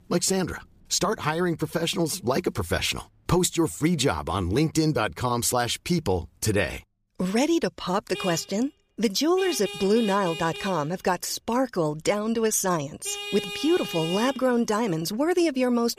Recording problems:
traffic noise; loud; throughout; 9 dB below the speech

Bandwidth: 15 kHz